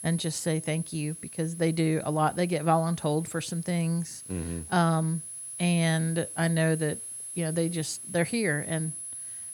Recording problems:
high-pitched whine; loud; throughout; 10.5 kHz, 10 dB below the speech
hiss; faint; throughout; 25 dB below the speech

